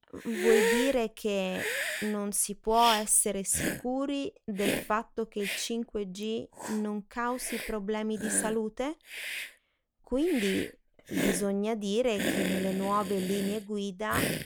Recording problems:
hiss; loud; throughout; 3 dB below the speech

